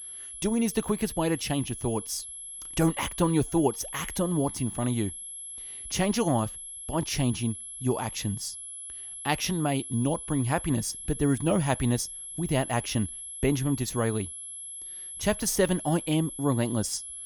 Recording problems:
high-pitched whine; loud; throughout; 11 kHz, 9 dB below the speech

